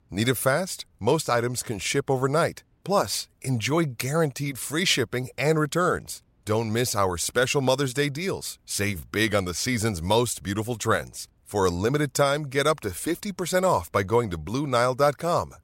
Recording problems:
none

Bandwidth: 16 kHz